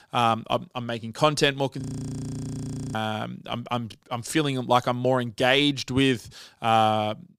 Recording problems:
audio freezing; at 2 s for 1 s

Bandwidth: 15.5 kHz